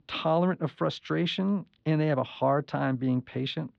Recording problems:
muffled; slightly; fading above 4 kHz

